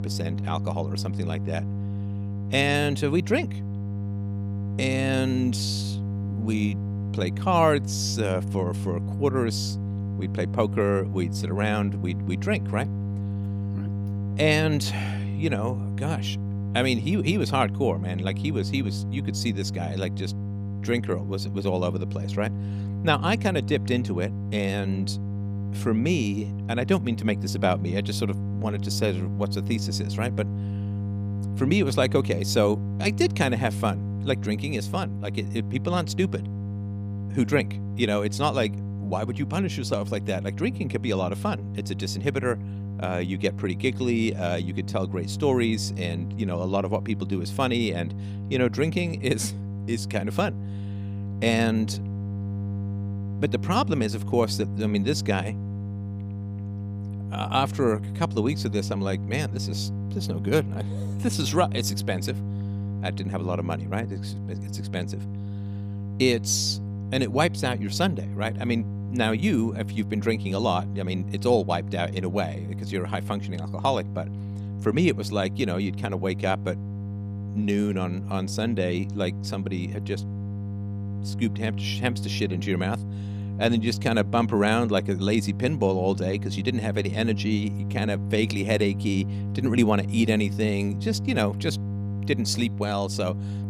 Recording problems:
electrical hum; noticeable; throughout; 50 Hz, 15 dB below the speech

